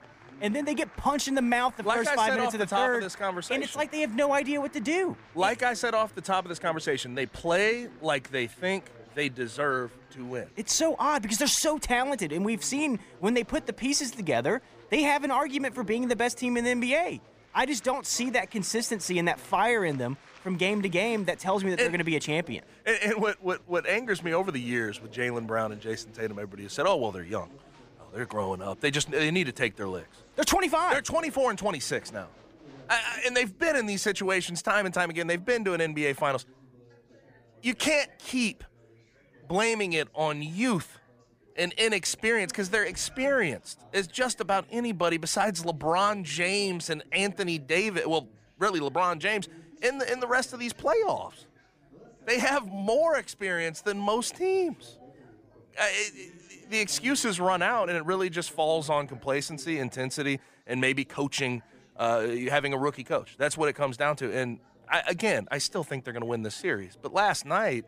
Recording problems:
chatter from many people; faint; throughout; 25 dB below the speech

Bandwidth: 15 kHz